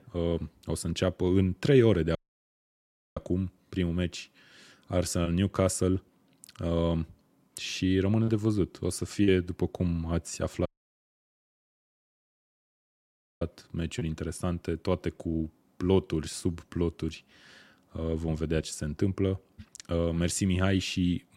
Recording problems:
audio cutting out; at 2 s for 1 s and at 11 s for 3 s

